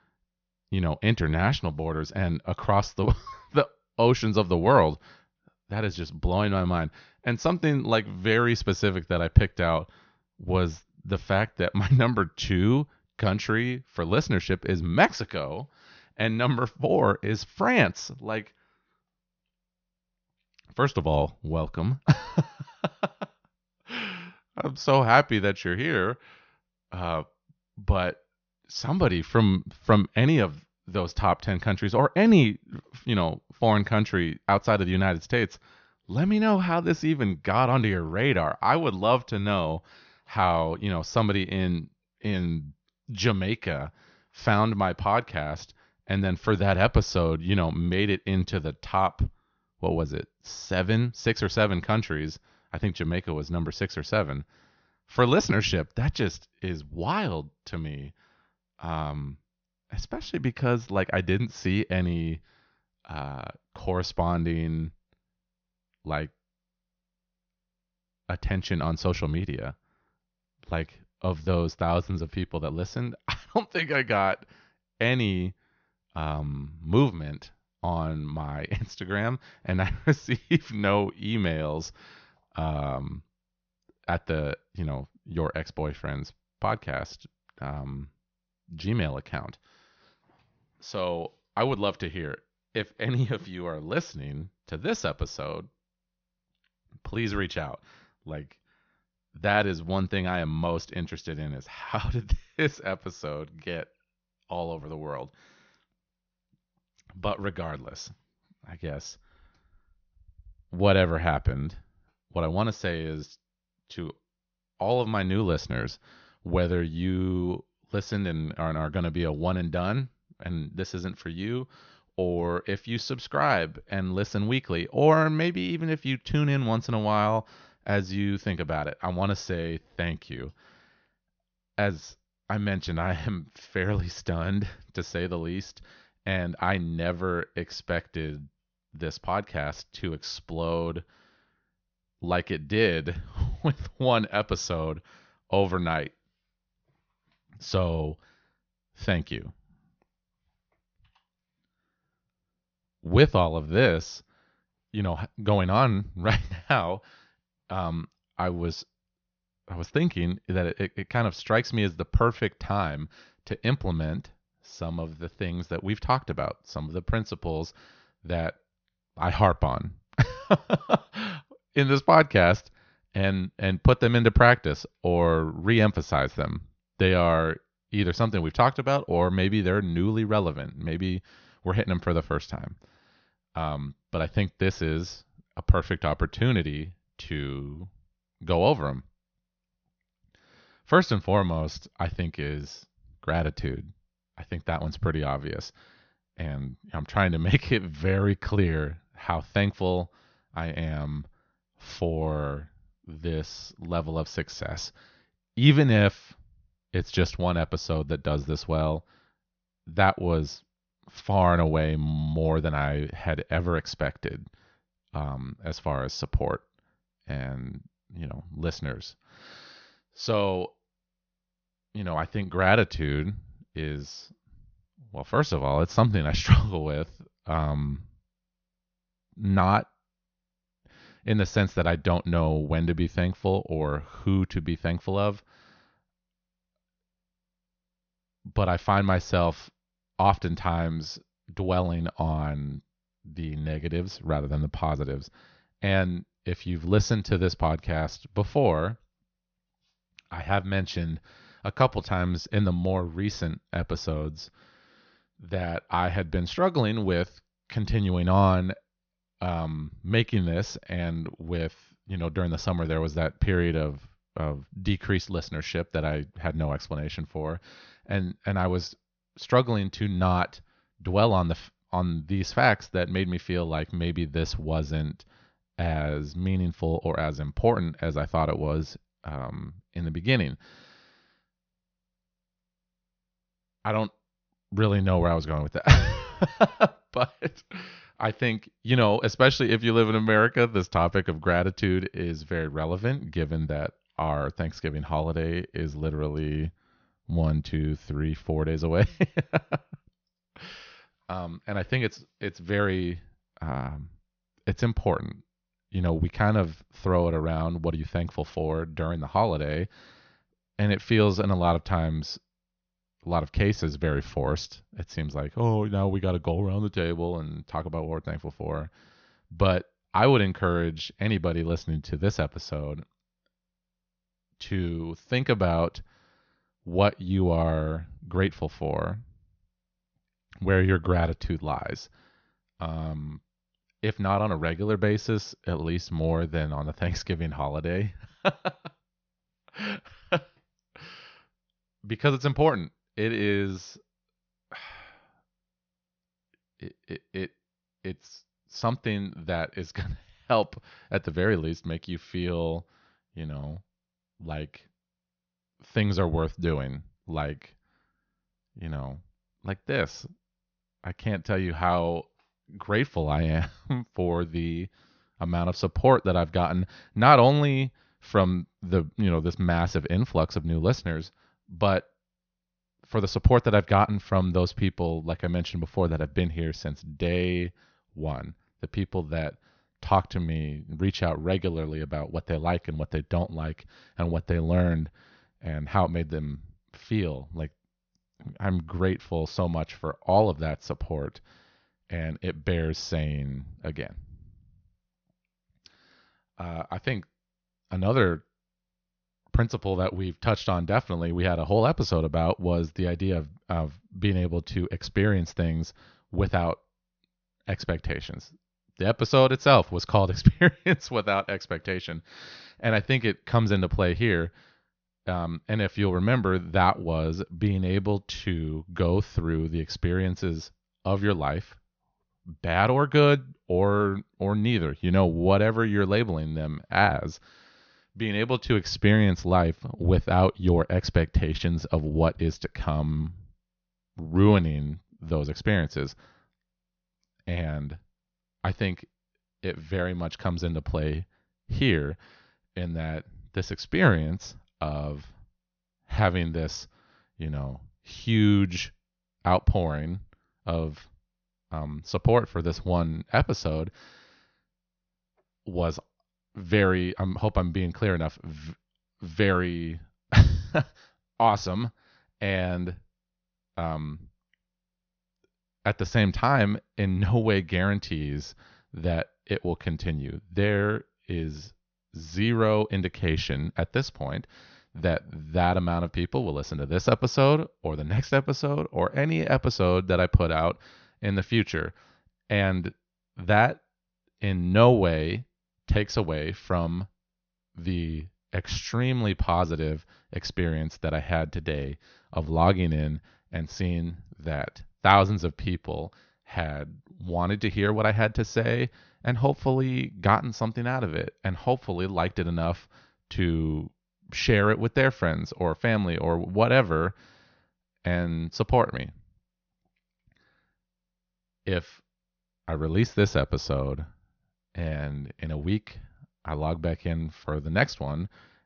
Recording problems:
high frequencies cut off; noticeable; nothing above 6.5 kHz

